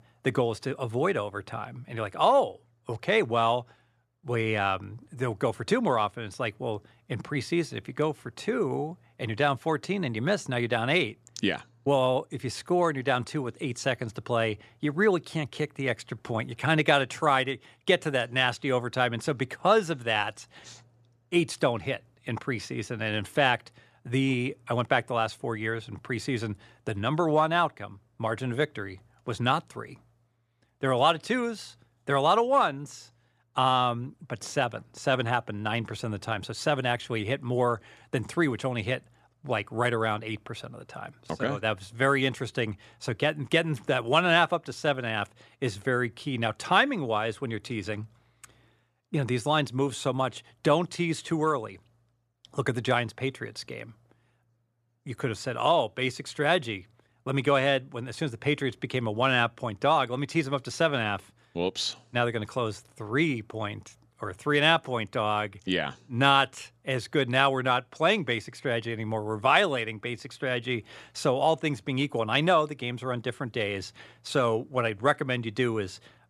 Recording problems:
none

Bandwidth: 14 kHz